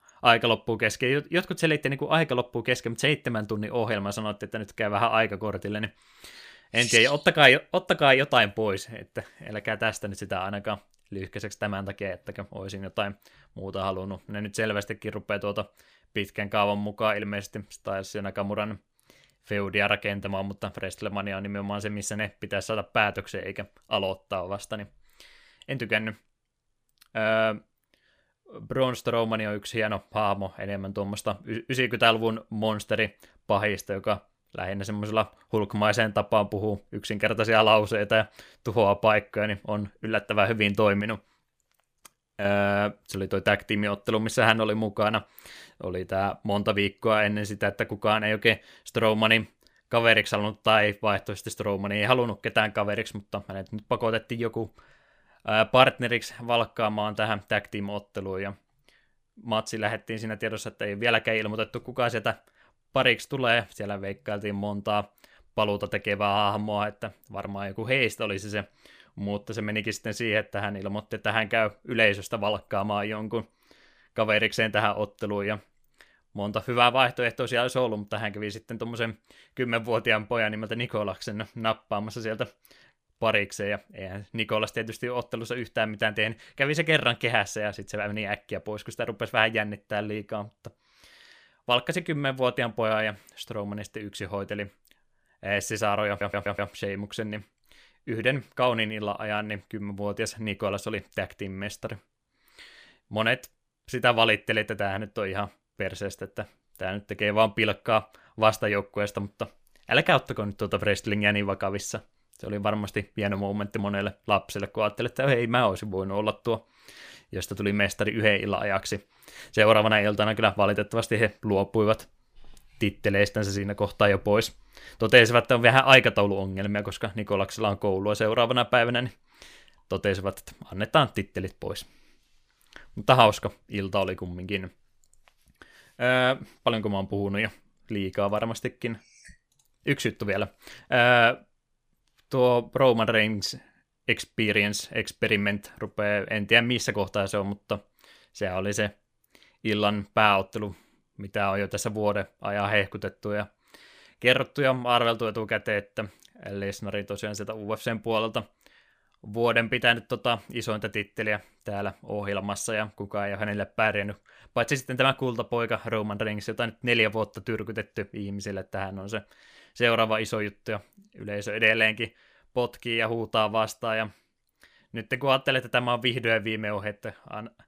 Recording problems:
audio stuttering; at 1:36

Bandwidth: 15 kHz